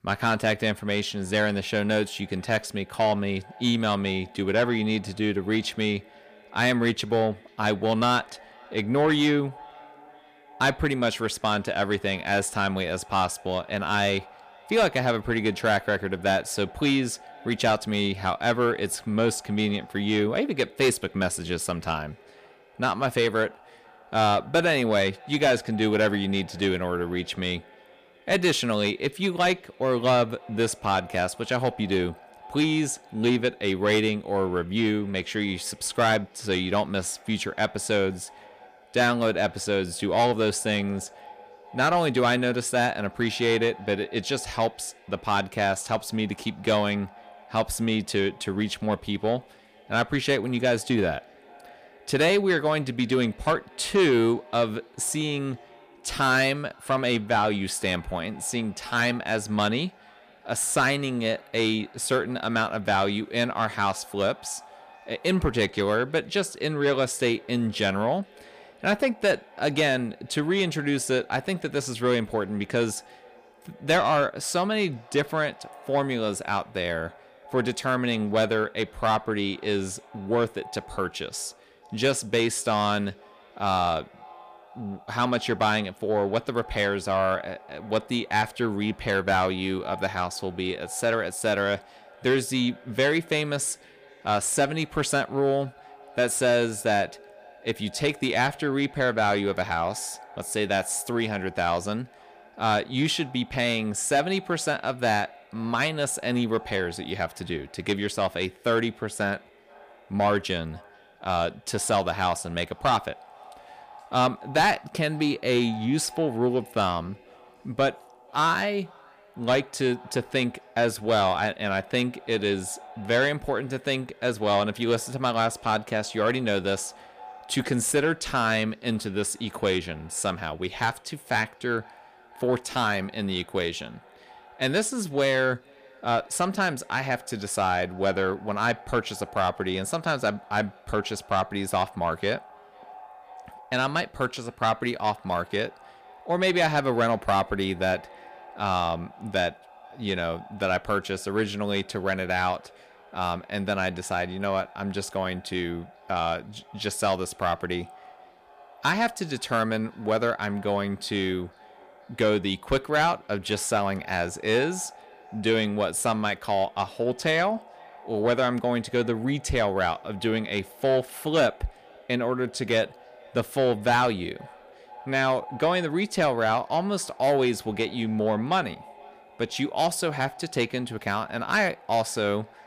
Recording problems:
echo of what is said; faint; throughout; 490 ms later, 25 dB below the speech
distortion; slight; 10 dB below the speech

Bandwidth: 15 kHz